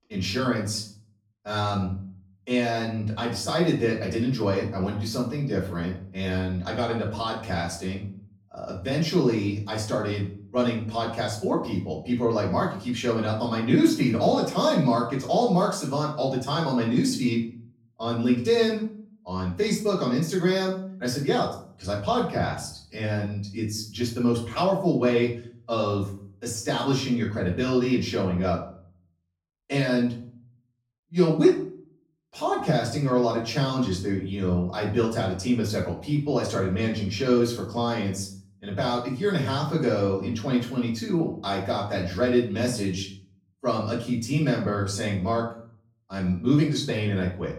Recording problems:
off-mic speech; far
room echo; slight; dies away in 0.5 s

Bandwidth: 17 kHz